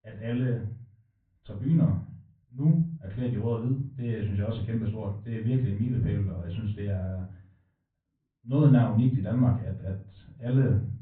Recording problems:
off-mic speech; far
high frequencies cut off; severe; nothing above 4 kHz
room echo; slight; dies away in 0.4 s
muffled; very slightly; fading above 2 kHz

